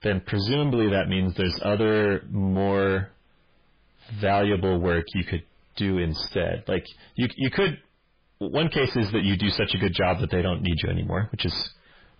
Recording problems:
distortion; heavy; 6 dB below the speech
garbled, watery; badly; nothing above 5 kHz

